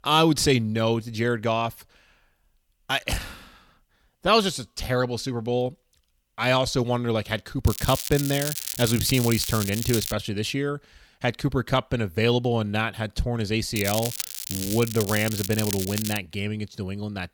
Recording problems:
crackling; loud; from 7.5 to 10 s and from 14 to 16 s; 5 dB below the speech

